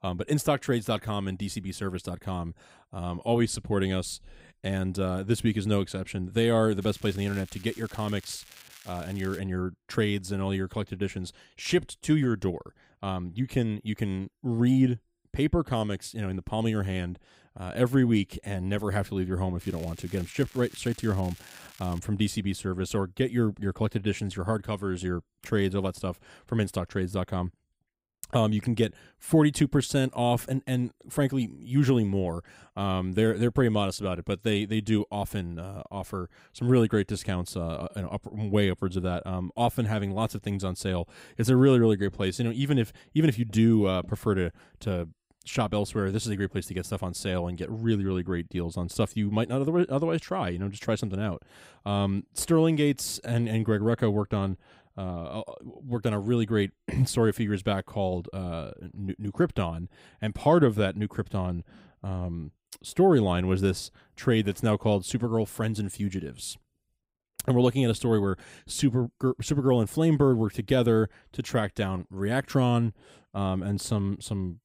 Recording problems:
crackling; faint; from 7 to 9.5 s and from 20 to 22 s; 20 dB below the speech

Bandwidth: 15.5 kHz